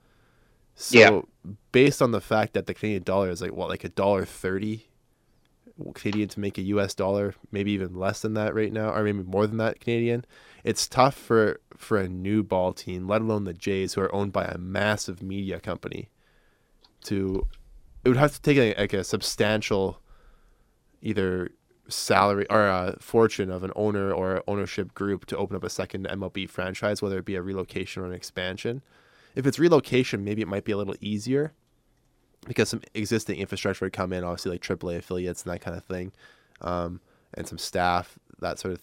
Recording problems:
none

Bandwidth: 16 kHz